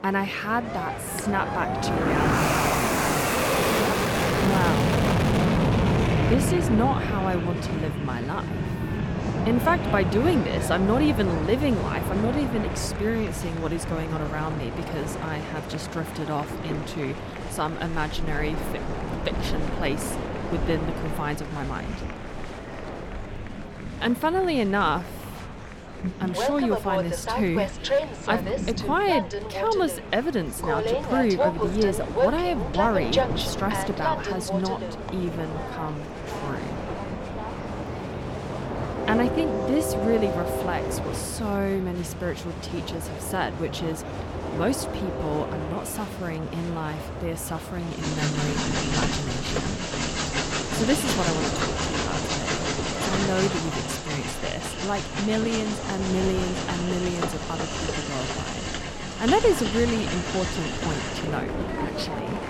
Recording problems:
train or aircraft noise; loud; throughout; as loud as the speech
murmuring crowd; noticeable; throughout; 10 dB below the speech

